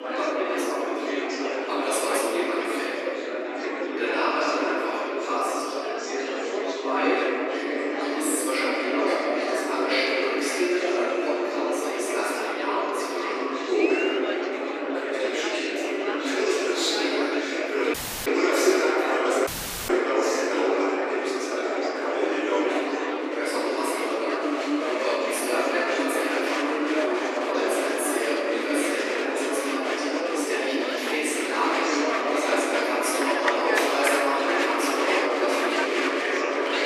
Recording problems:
echo of what is said; strong; from 8 s on; 520 ms later, 10 dB below the speech
room echo; strong; dies away in 2.7 s
off-mic speech; far
thin; somewhat; fading below 250 Hz
murmuring crowd; loud; throughout; 1 dB below the speech
audio cutting out; at 18 s and at 19 s

